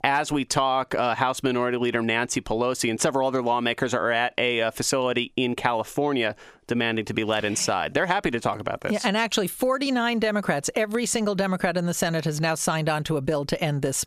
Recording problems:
squashed, flat; somewhat

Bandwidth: 14.5 kHz